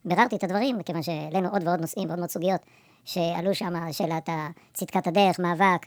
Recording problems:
wrong speed and pitch; too fast and too high; 1.6 times normal speed

